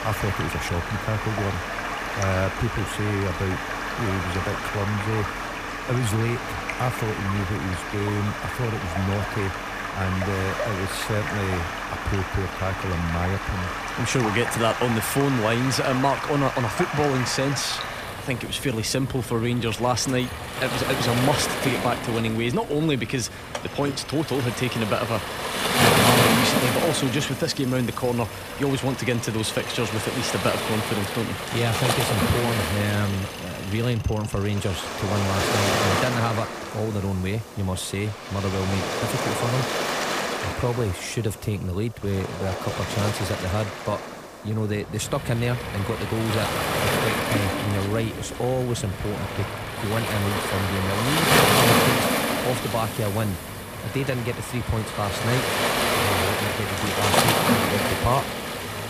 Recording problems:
rain or running water; very loud; throughout; as loud as the speech
machinery noise; noticeable; throughout; 15 dB below the speech

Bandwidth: 15 kHz